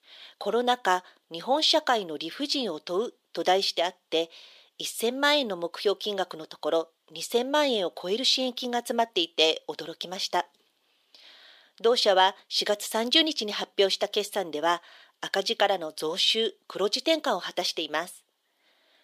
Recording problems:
thin; somewhat; fading below 350 Hz

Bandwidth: 15 kHz